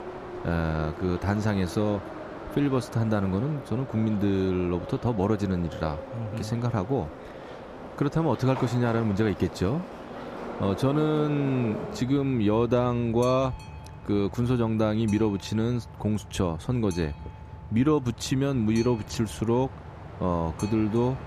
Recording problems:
train or aircraft noise; noticeable; throughout; 15 dB below the speech

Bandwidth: 14.5 kHz